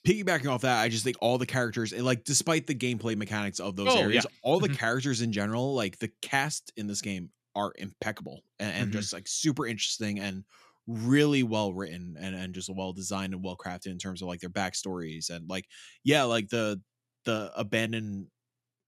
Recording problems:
none

